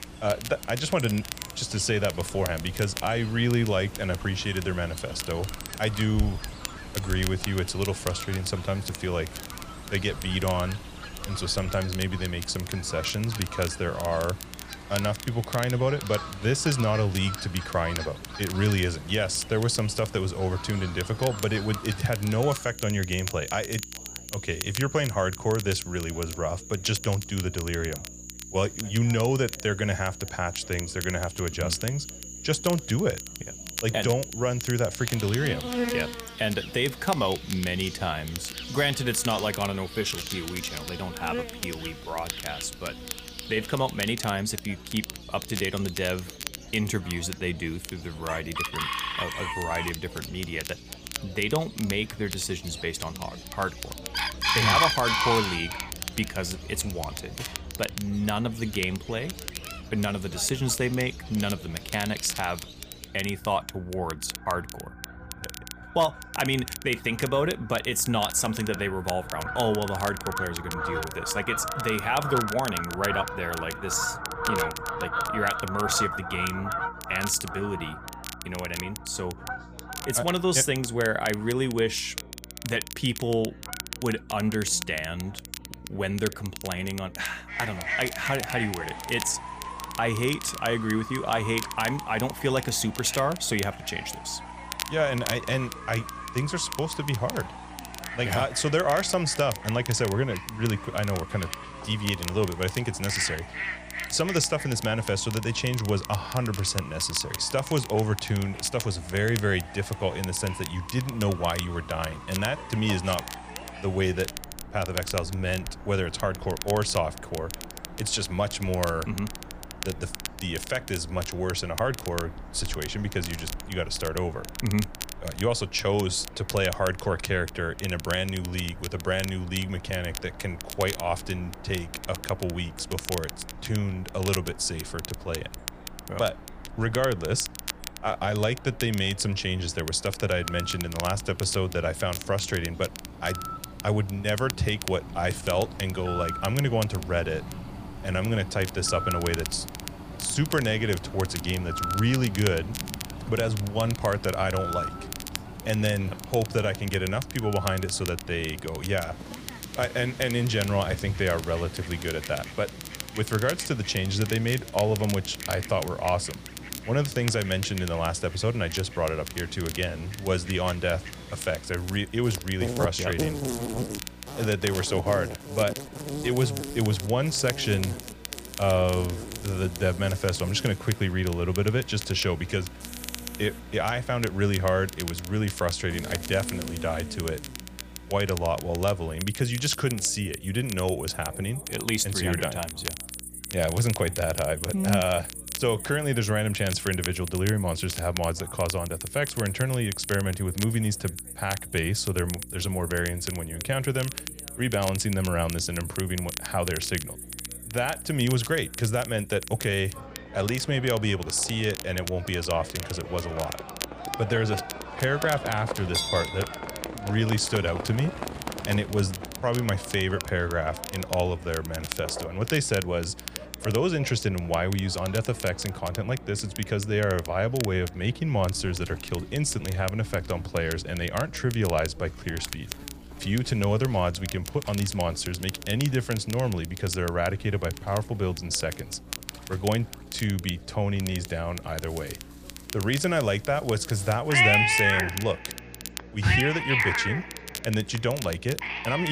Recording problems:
animal sounds; loud; throughout; 8 dB below the speech
crackle, like an old record; noticeable; 10 dB below the speech
electrical hum; faint; throughout; 60 Hz, 30 dB below the speech
background chatter; faint; throughout; 3 voices, 25 dB below the speech
abrupt cut into speech; at the end

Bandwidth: 15 kHz